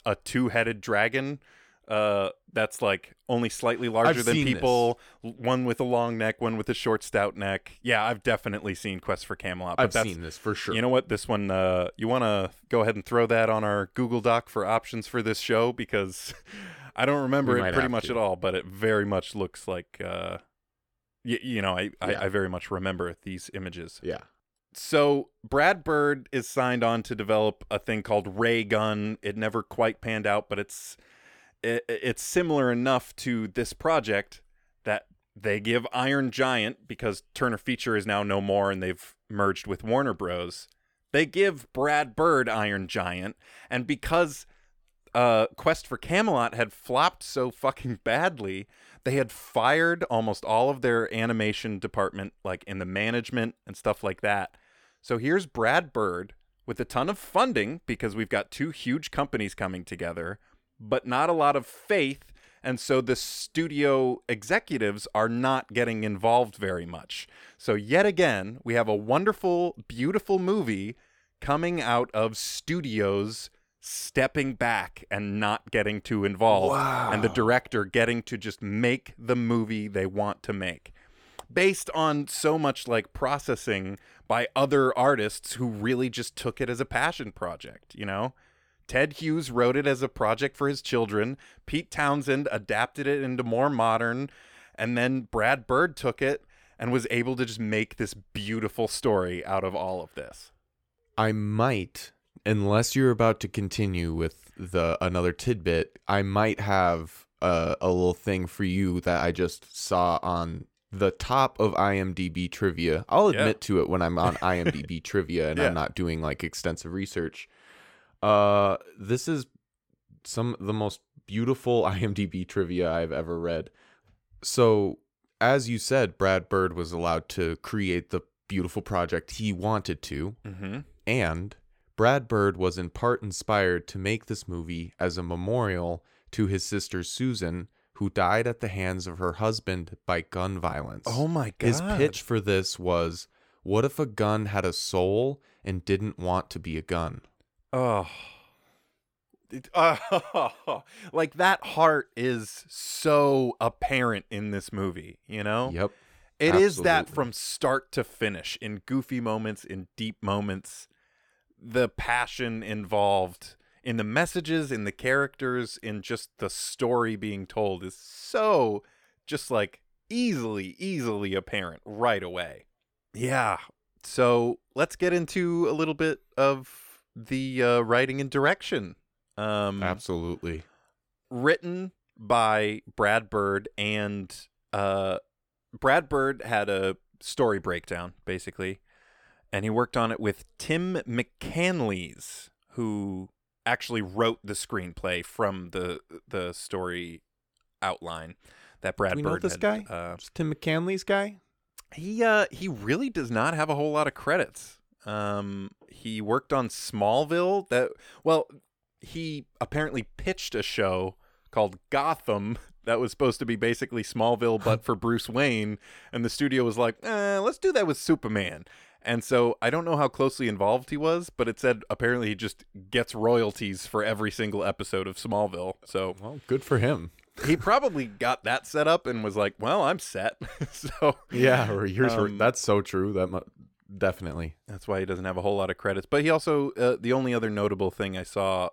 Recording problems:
none

